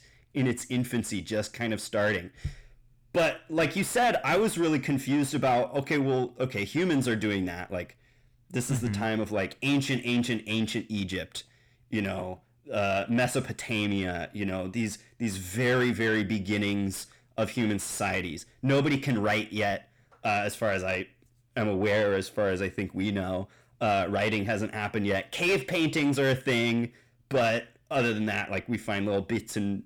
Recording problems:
distortion; heavy; 7 dB below the speech

